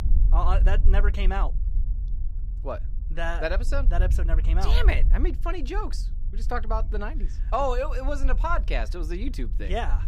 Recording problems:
low rumble; noticeable; throughout; 20 dB below the speech

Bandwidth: 15.5 kHz